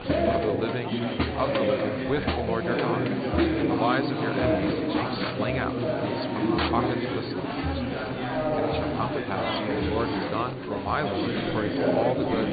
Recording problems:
high frequencies cut off; severe; nothing above 4.5 kHz
chatter from many people; very loud; throughout; 5 dB above the speech

